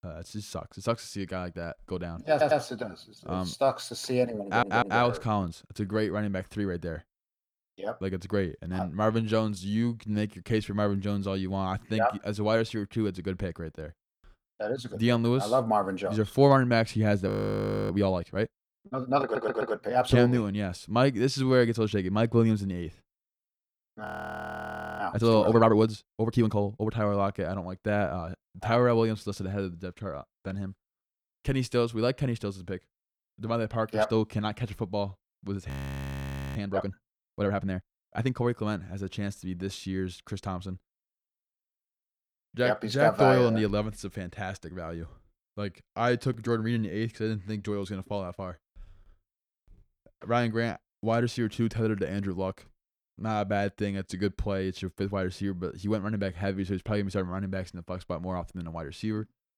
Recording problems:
audio stuttering; at 2.5 s, at 4.5 s and at 19 s
audio freezing; at 17 s for 0.5 s, at 24 s for 1 s and at 36 s for 1 s

